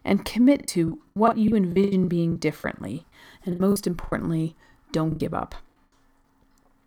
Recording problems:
choppy; very; 17% of the speech affected

